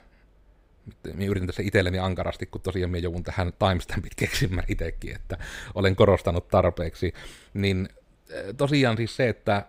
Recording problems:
none

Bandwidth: 15.5 kHz